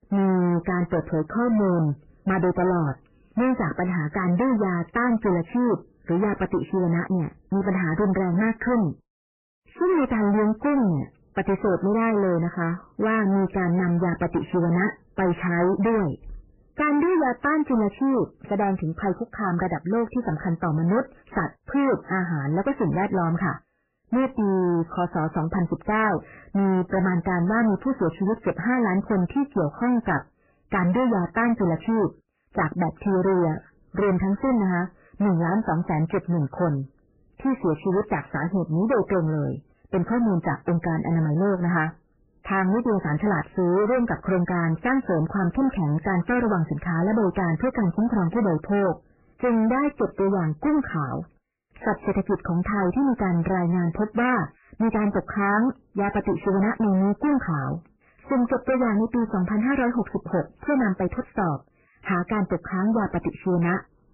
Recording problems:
distortion; heavy; 20% of the sound clipped
garbled, watery; badly; nothing above 3 kHz

